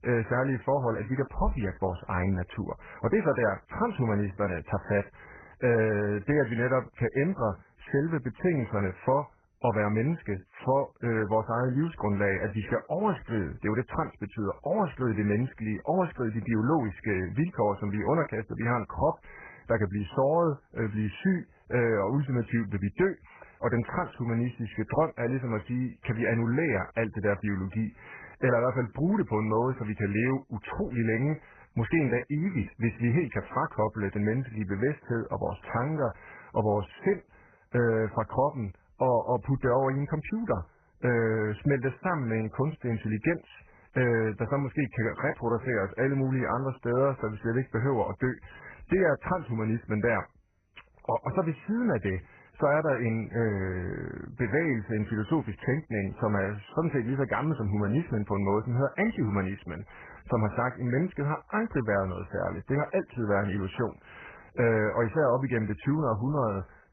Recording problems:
garbled, watery; badly

